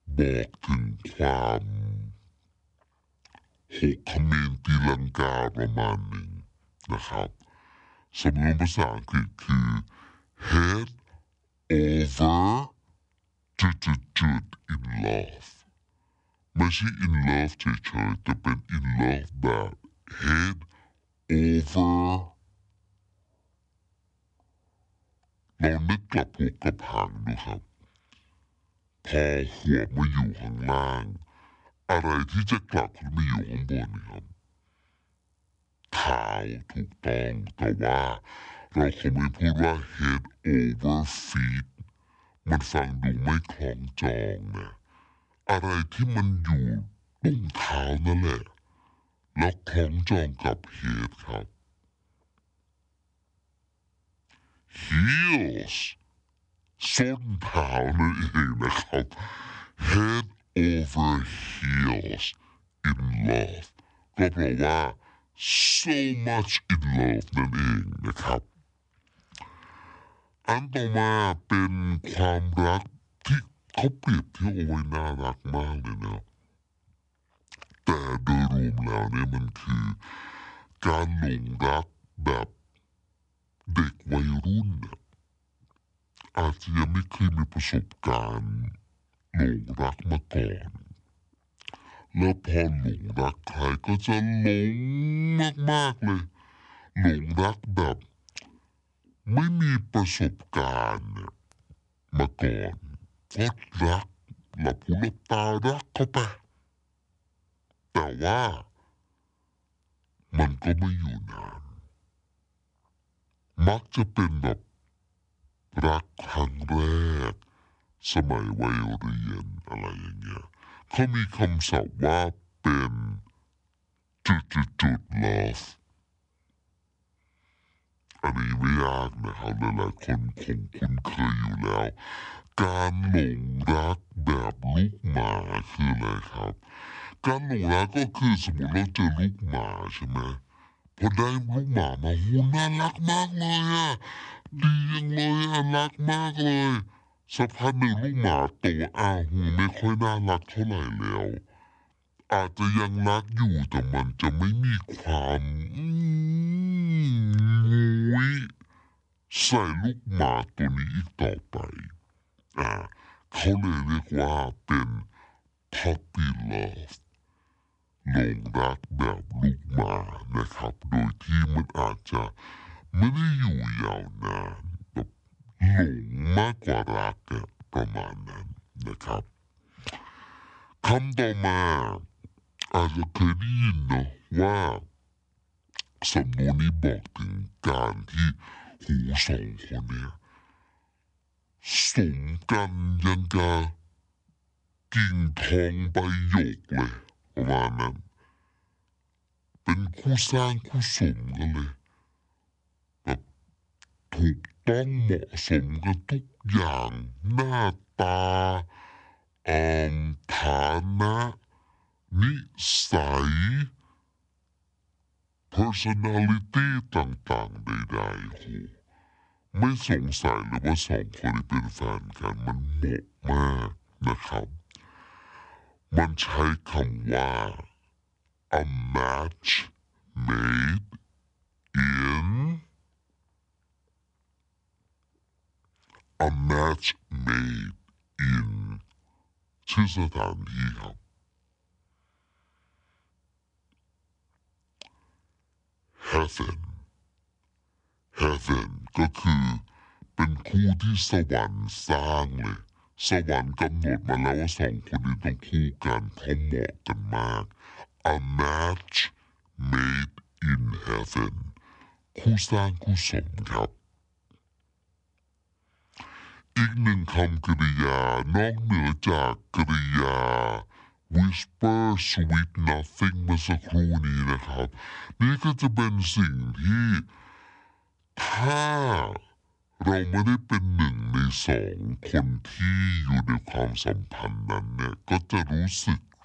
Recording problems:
wrong speed and pitch; too slow and too low; 0.6 times normal speed

